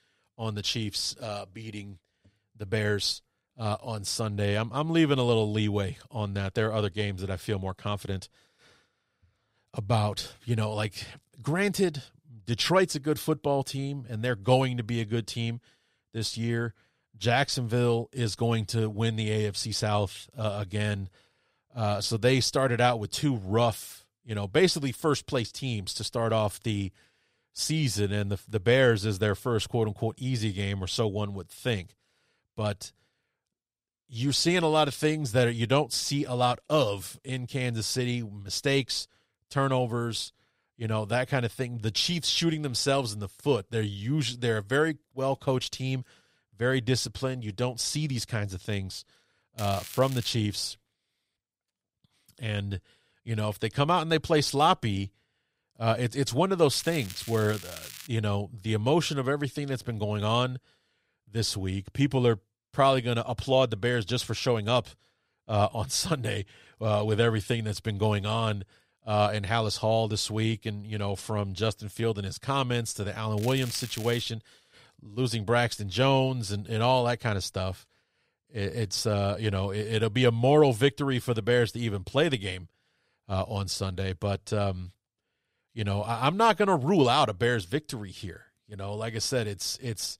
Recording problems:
crackling; noticeable; at 50 s, from 57 to 58 s and at 1:13; 15 dB below the speech

